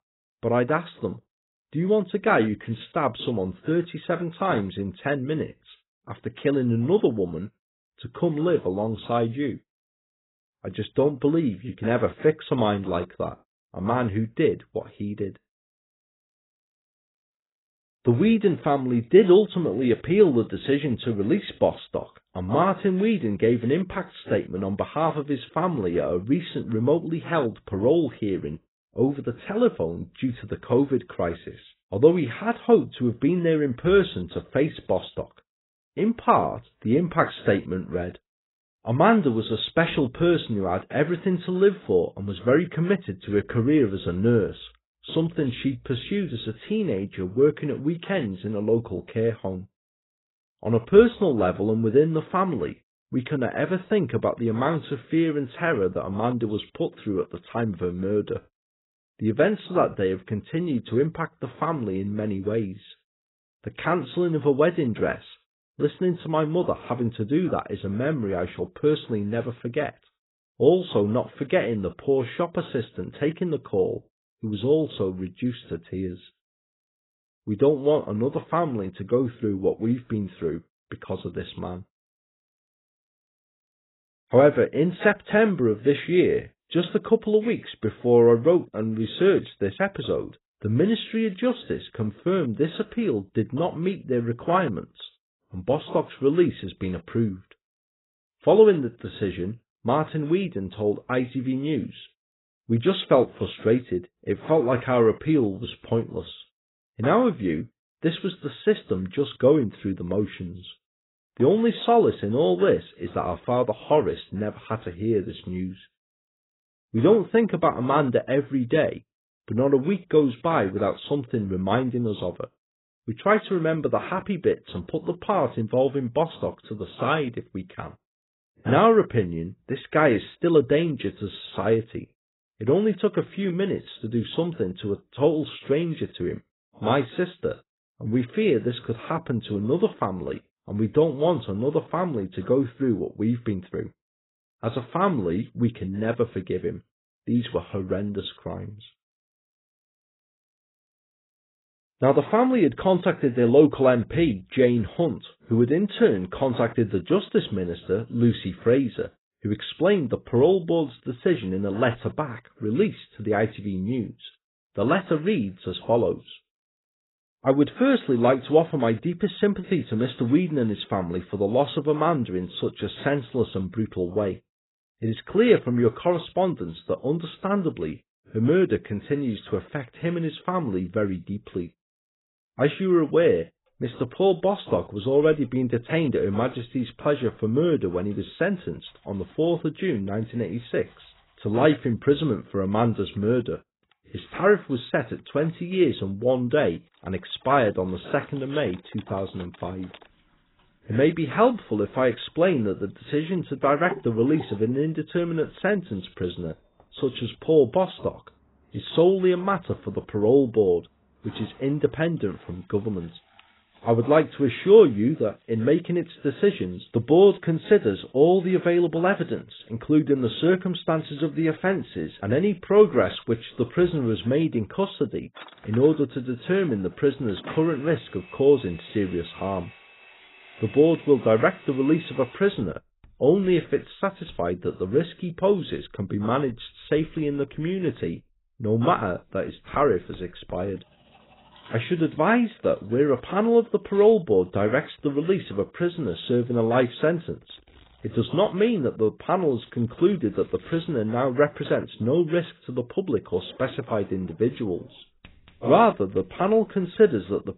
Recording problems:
garbled, watery; badly; nothing above 4 kHz
household noises; faint; from 3:04 on; 25 dB below the speech

